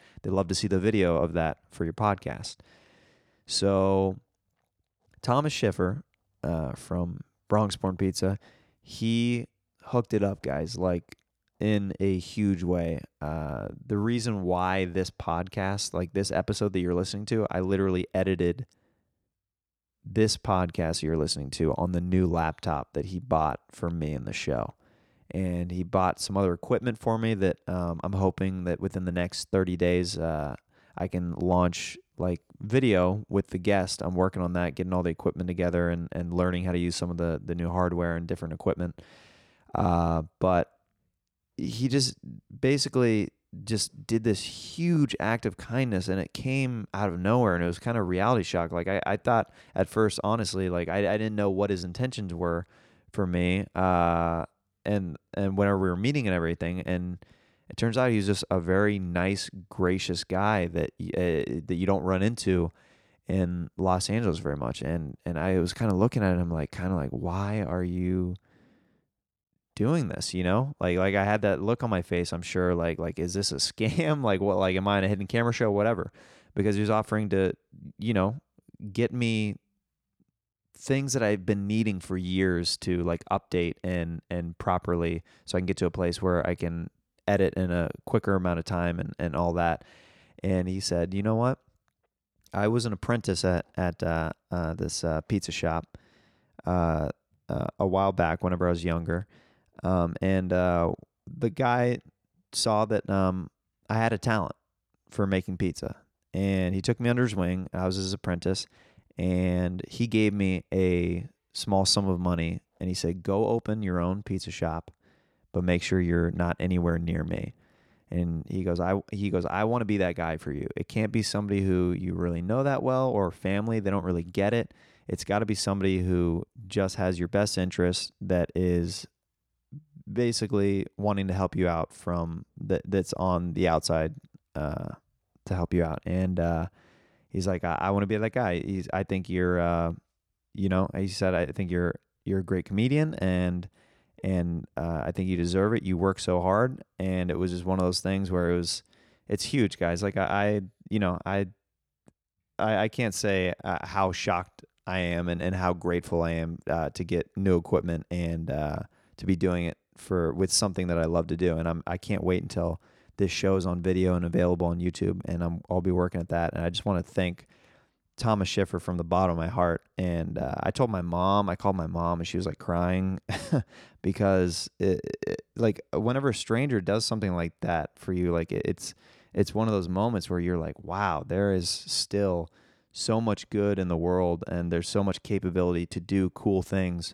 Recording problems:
none

